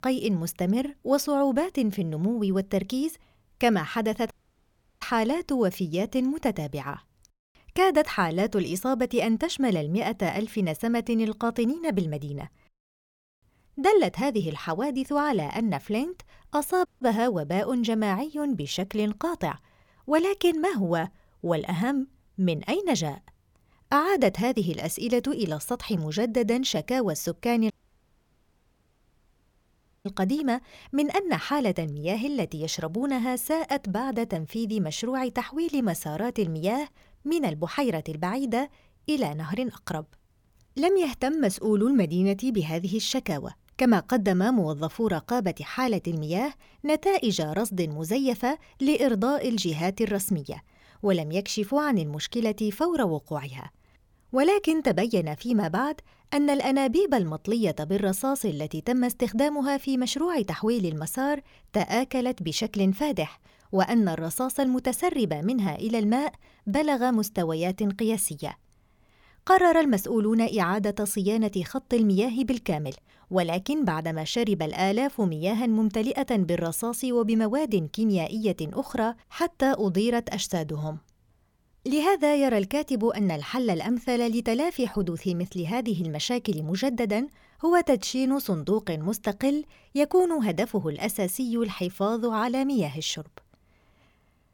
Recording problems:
audio cutting out; at 4.5 s for 0.5 s, at 17 s and at 28 s for 2.5 s

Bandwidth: 18 kHz